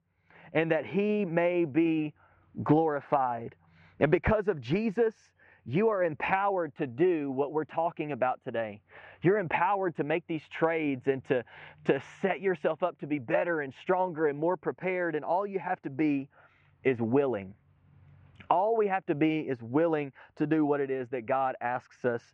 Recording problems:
muffled; very; fading above 2.5 kHz

